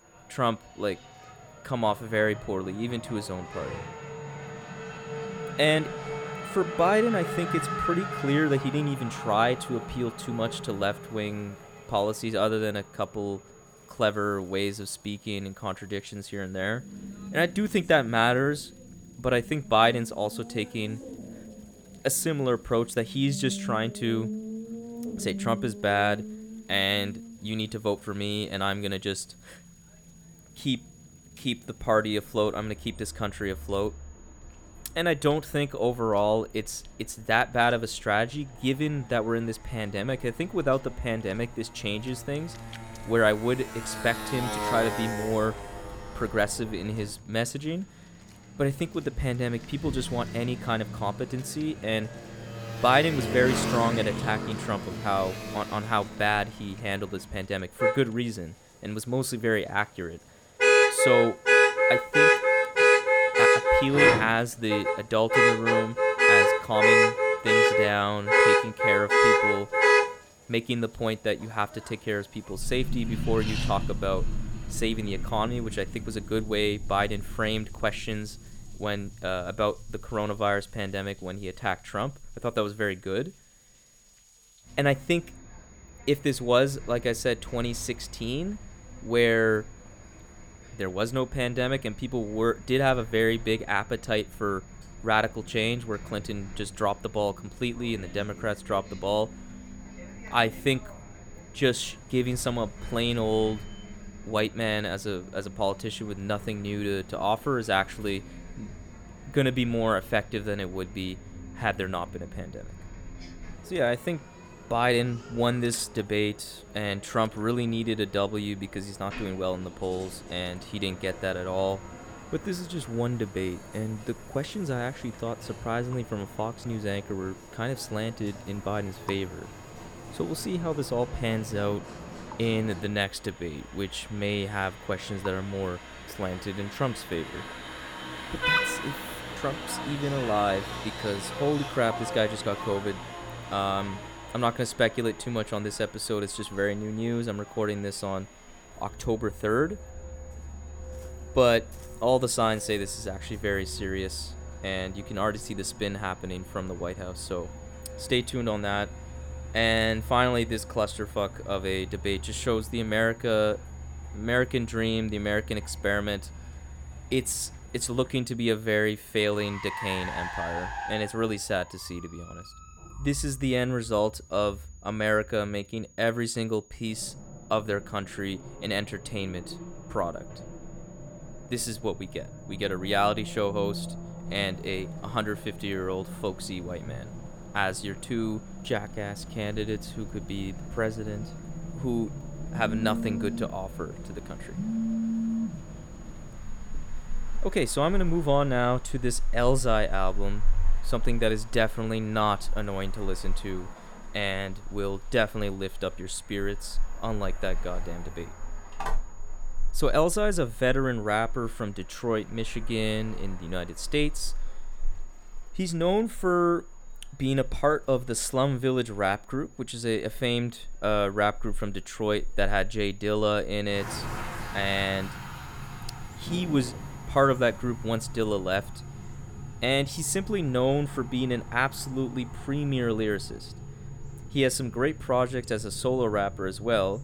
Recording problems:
traffic noise; loud; throughout; 1 dB below the speech
high-pitched whine; faint; throughout; 6.5 kHz, 30 dB below the speech
rain or running water; faint; throughout; 30 dB below the speech
phone ringing; loud; from 3:09 to 3:17; peak level with the speech
phone ringing; noticeable; at 3:29; peak 8 dB below the speech

